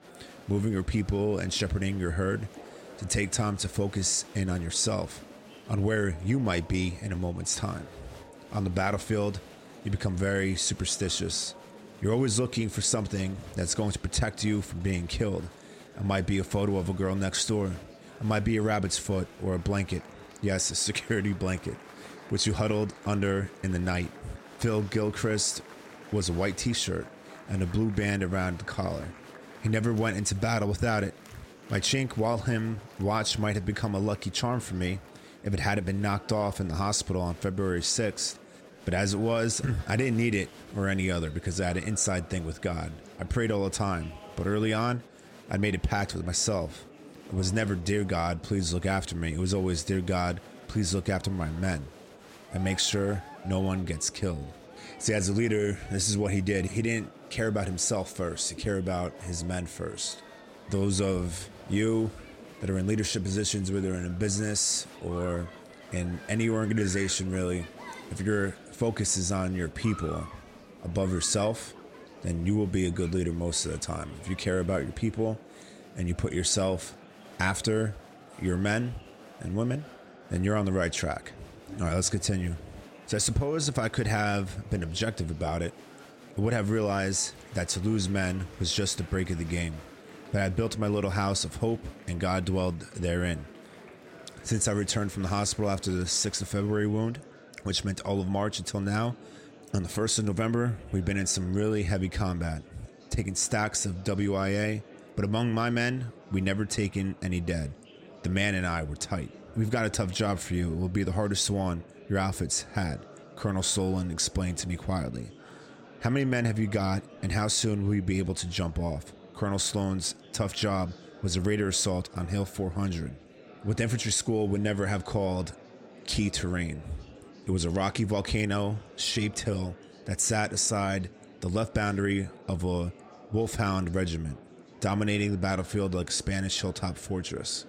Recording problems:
murmuring crowd; noticeable; throughout; 20 dB below the speech

